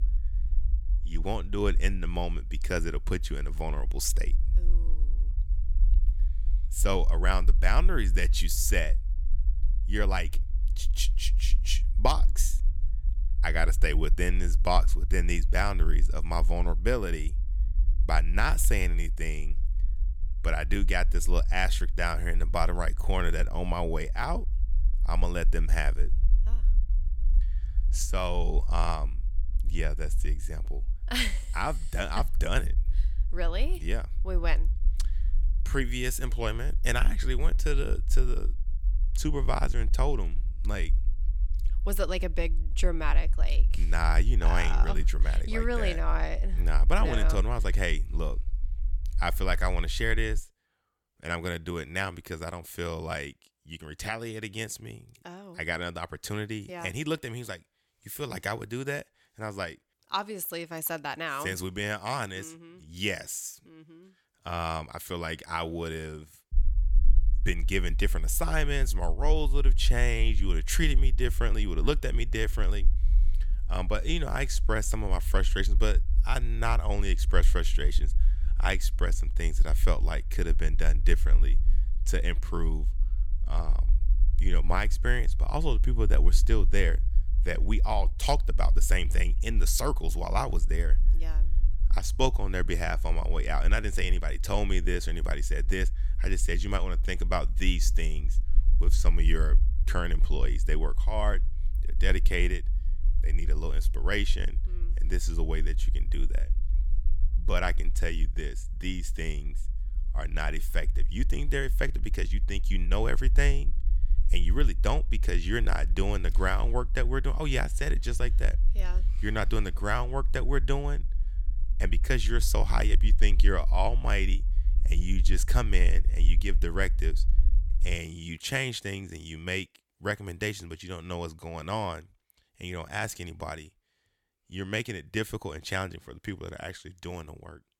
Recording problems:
low rumble; faint; until 50 s and from 1:07 to 2:08; 20 dB below the speech

